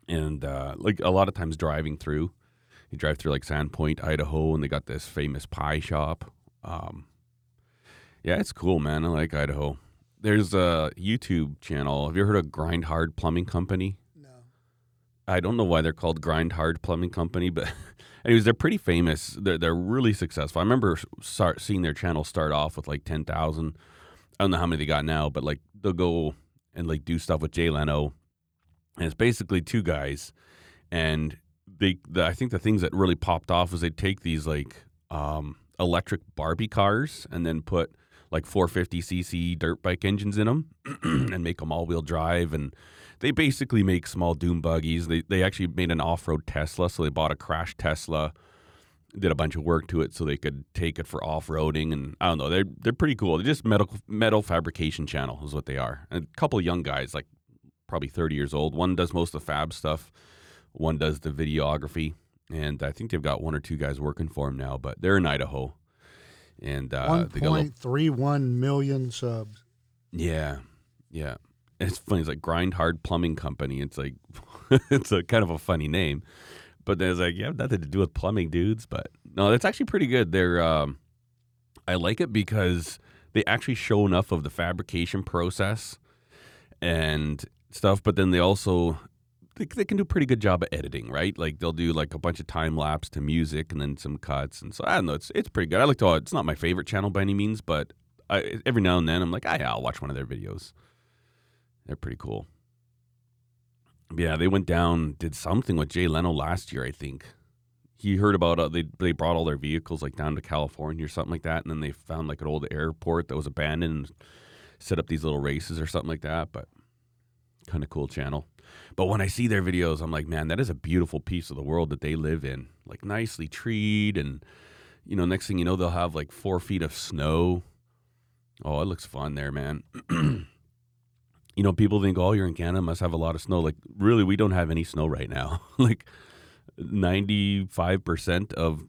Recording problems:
none

